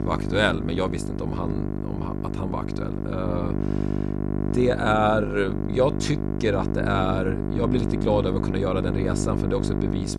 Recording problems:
electrical hum; loud; throughout; 50 Hz, 6 dB below the speech

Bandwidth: 13.5 kHz